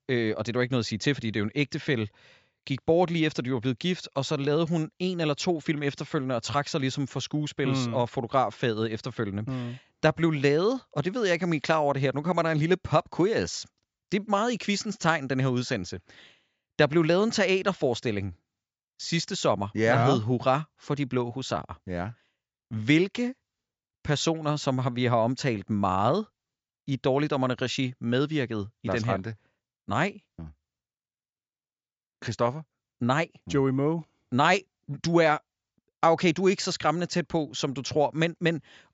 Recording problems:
high frequencies cut off; noticeable; nothing above 7.5 kHz

